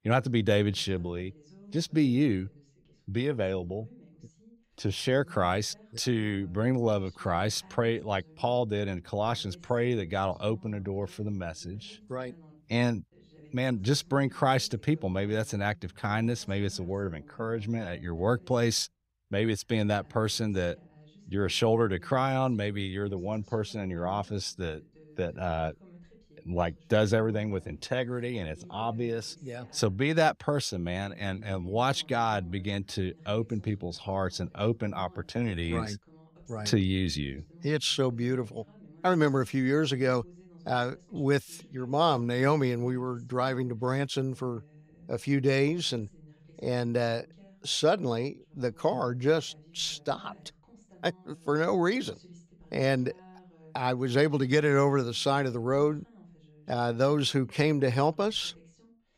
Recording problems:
voice in the background; faint; throughout; 25 dB below the speech

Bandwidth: 15.5 kHz